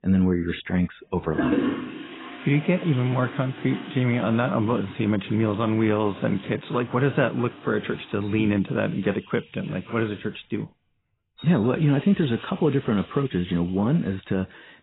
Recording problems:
garbled, watery; badly; nothing above 4 kHz
muffled; very slightly; fading above 3 kHz
household noises; noticeable; throughout; 10 dB below the speech

